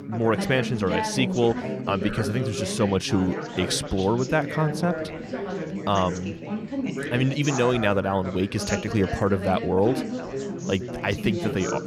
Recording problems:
background chatter; loud; throughout; 4 voices, 6 dB below the speech

